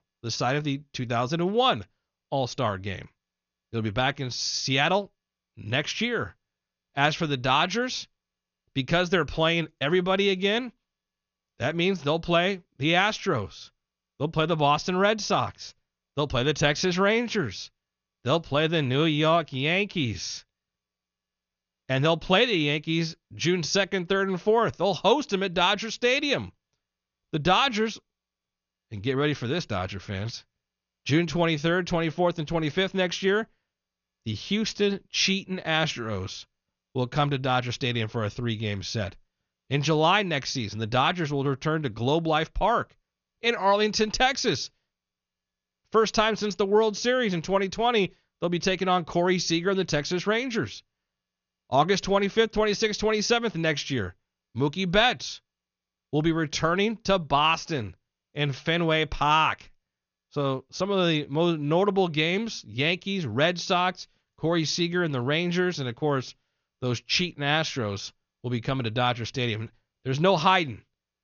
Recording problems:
high frequencies cut off; noticeable; nothing above 6.5 kHz

